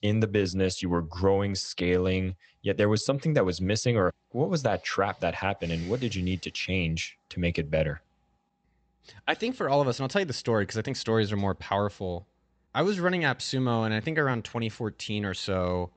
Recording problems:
high frequencies cut off; noticeable; nothing above 8 kHz

